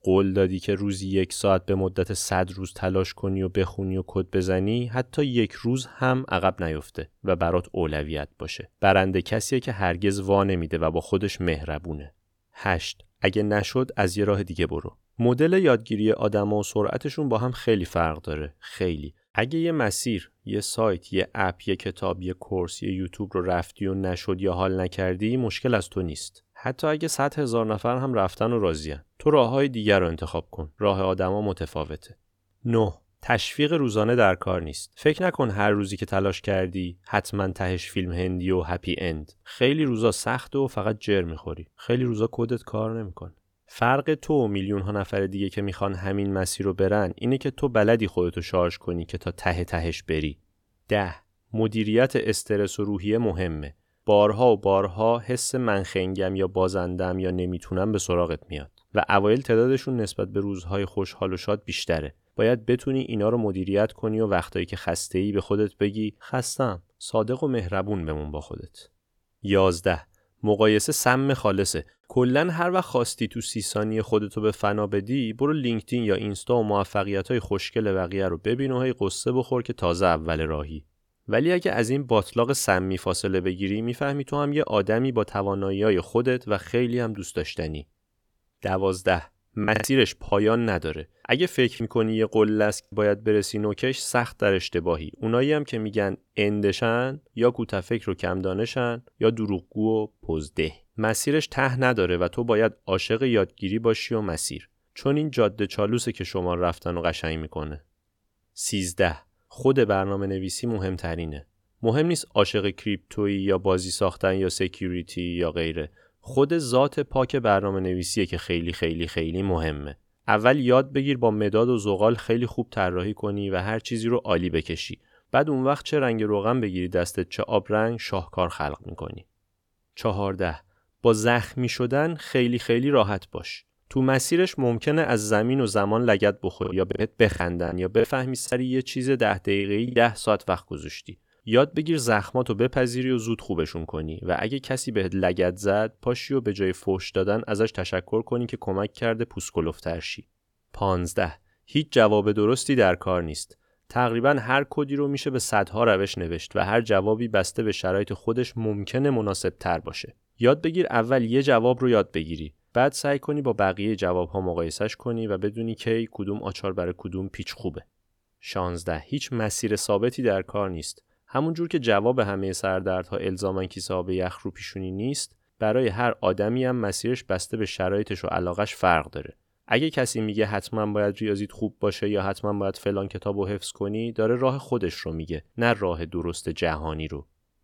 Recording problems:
choppy; very; from 1:30 to 1:33 and from 2:17 to 2:20; 11% of the speech affected

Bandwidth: 18.5 kHz